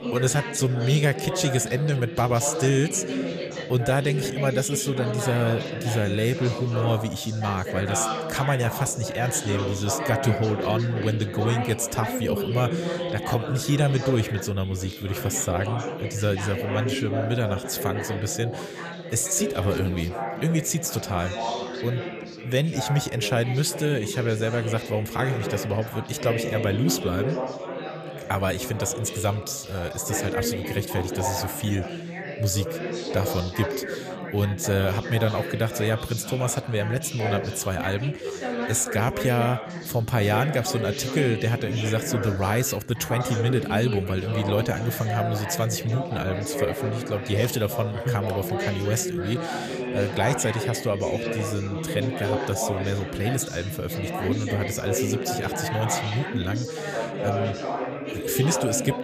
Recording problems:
chatter from many people; loud; throughout; 5 dB below the speech

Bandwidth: 14.5 kHz